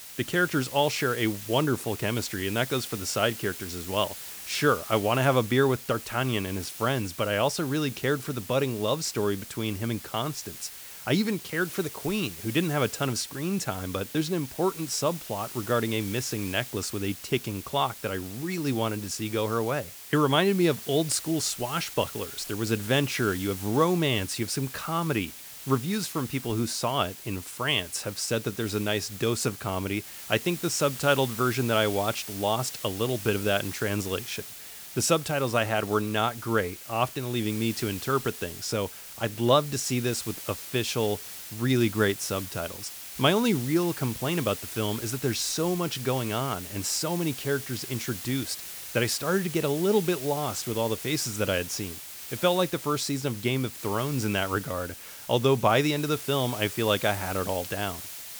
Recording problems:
hiss; loud; throughout; 10 dB below the speech

